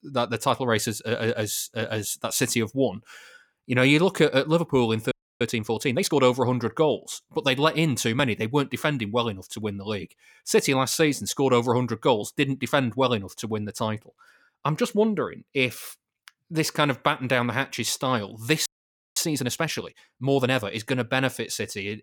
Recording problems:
audio freezing; at 5 s and at 19 s for 0.5 s

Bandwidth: 18 kHz